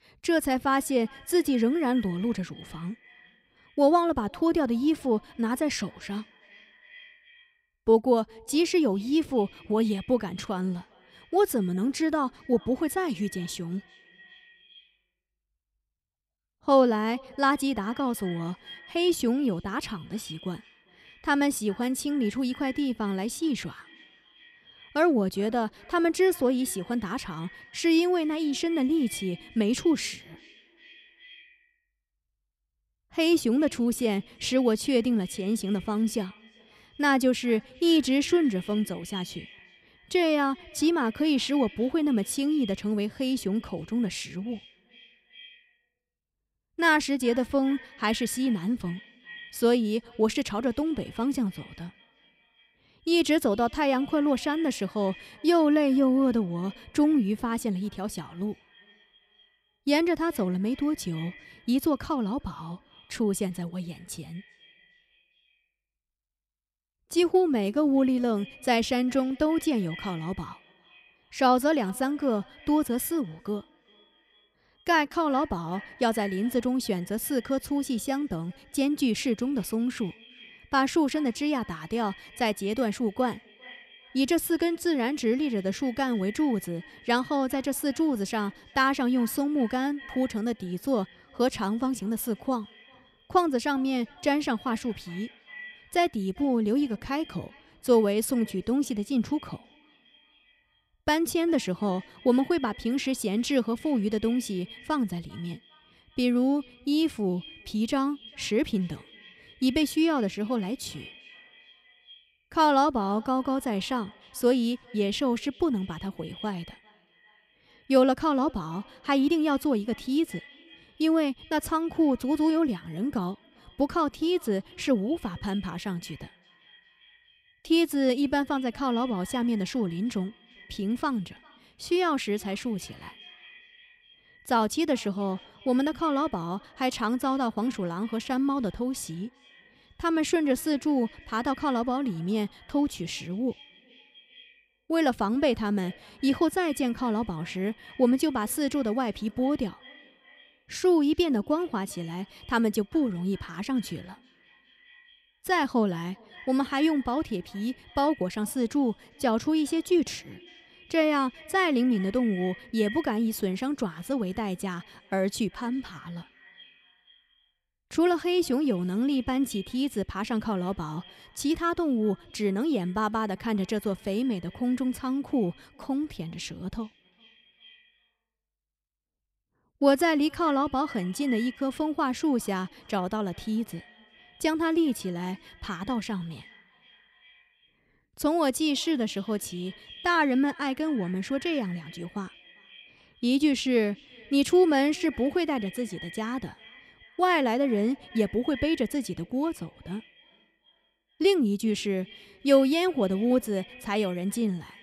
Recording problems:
echo of what is said; faint; throughout; 400 ms later, 20 dB below the speech

